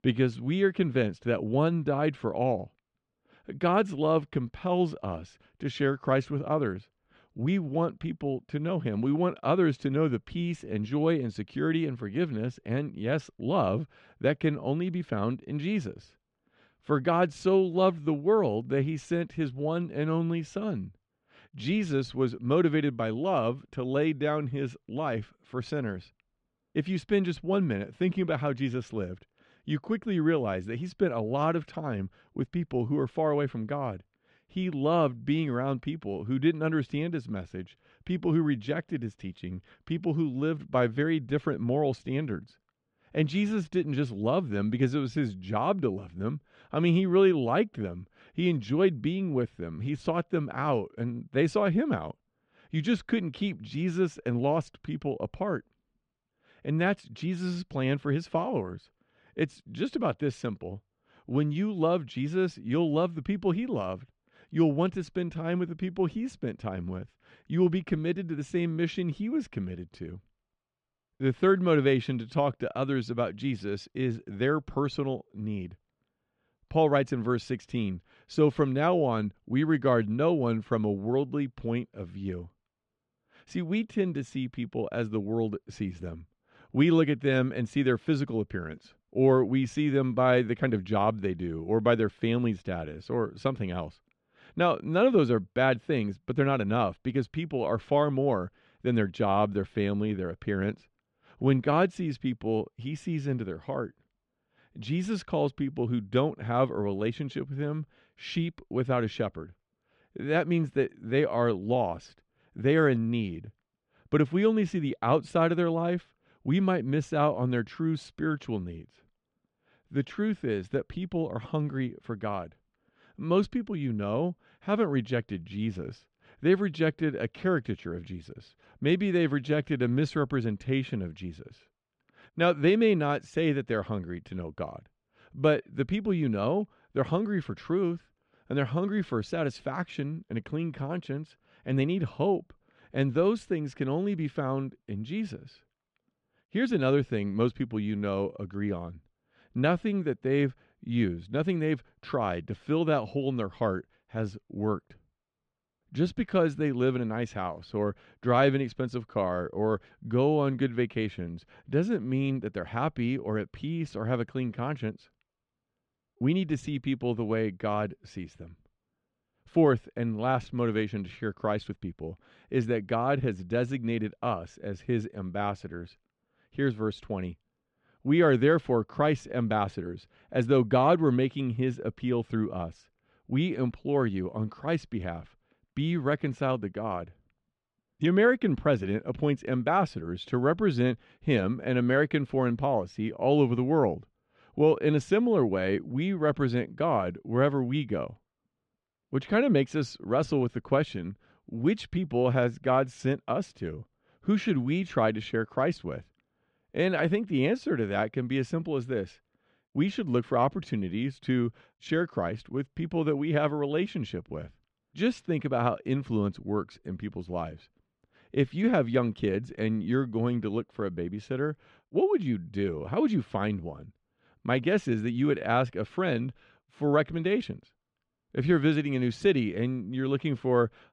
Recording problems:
muffled; slightly; fading above 3.5 kHz

